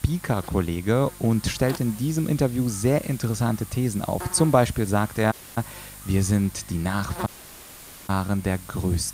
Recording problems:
electrical hum; noticeable; throughout; 50 Hz, 15 dB below the speech
hiss; noticeable; throughout; 20 dB below the speech
audio cutting out; at 5.5 s and at 7.5 s for 1 s

